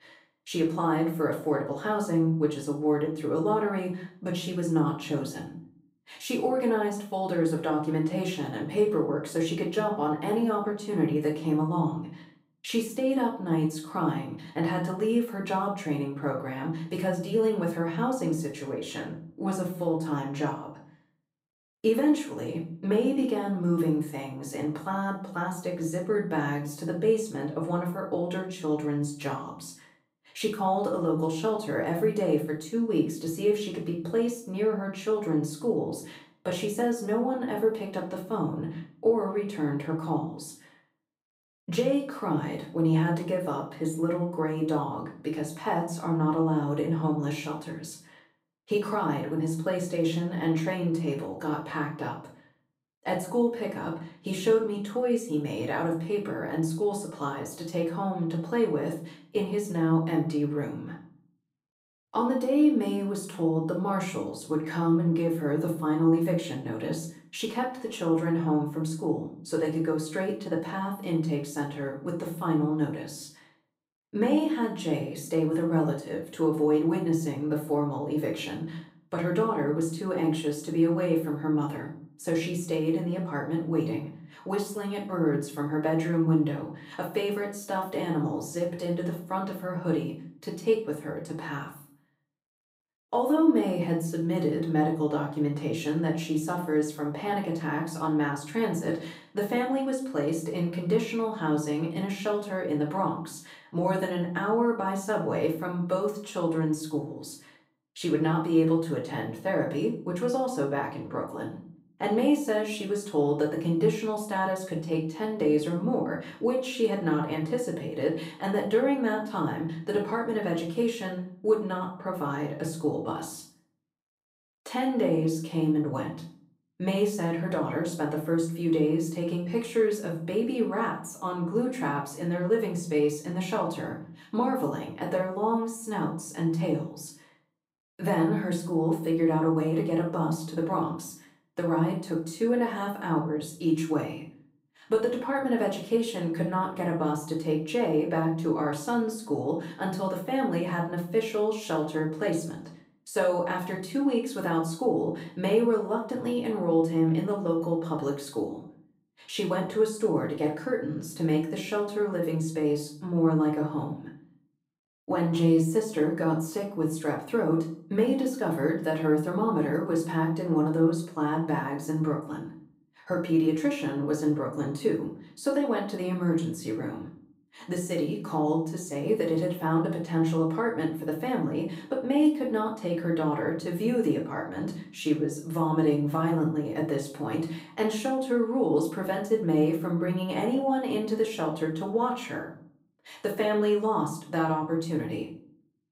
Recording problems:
off-mic speech; far
room echo; slight; dies away in 0.4 s

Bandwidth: 15.5 kHz